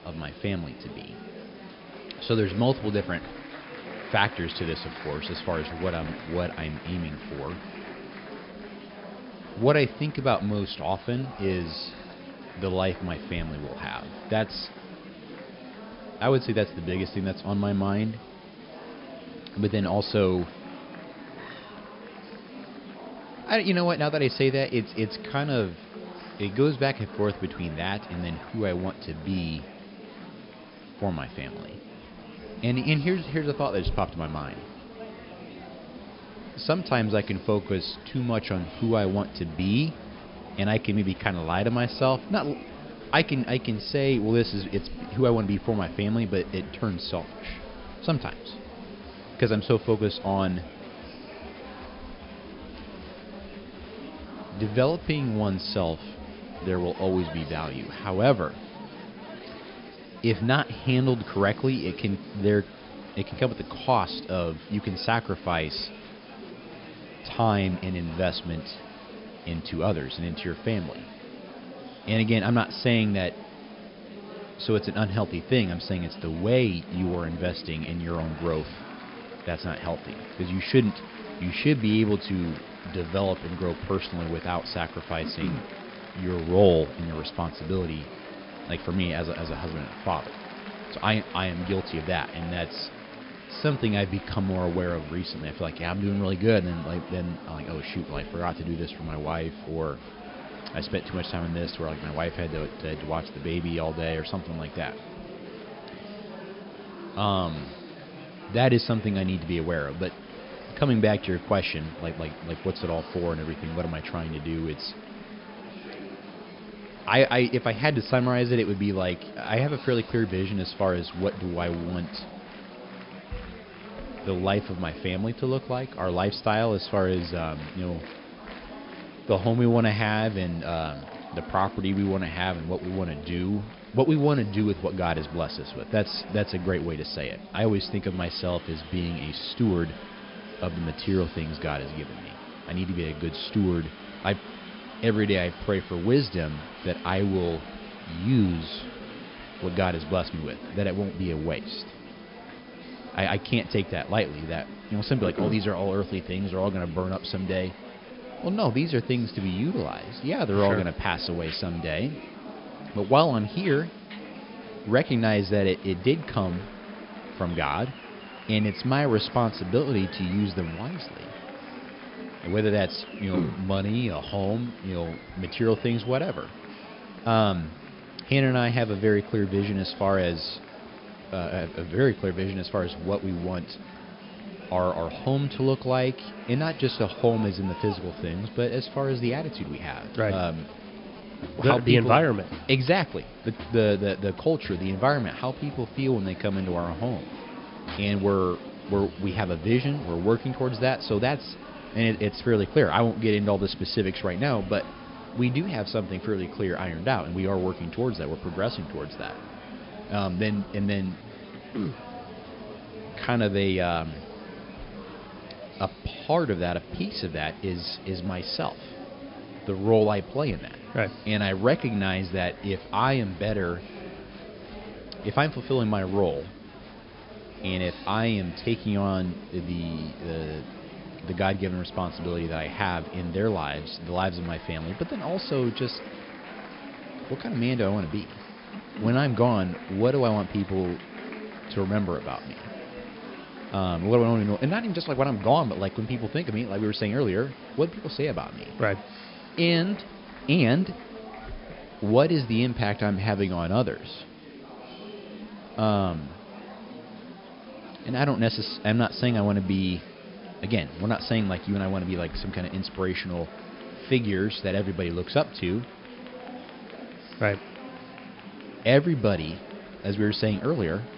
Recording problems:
high frequencies cut off; noticeable; nothing above 5.5 kHz
murmuring crowd; noticeable; throughout; 15 dB below the speech
hiss; faint; throughout; 25 dB below the speech

